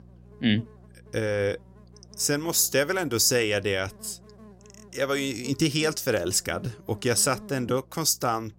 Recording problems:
electrical hum; faint; throughout; 60 Hz, 25 dB below the speech

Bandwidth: 16 kHz